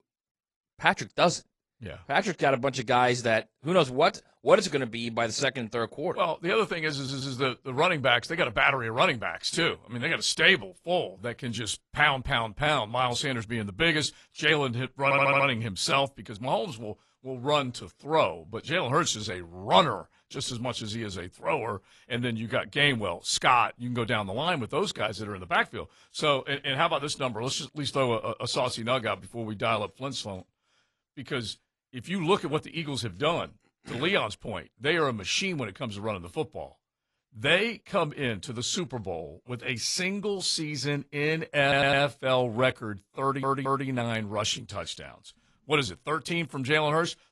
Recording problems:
garbled, watery; slightly; nothing above 11 kHz
audio stuttering; 4 times, first at 7 s

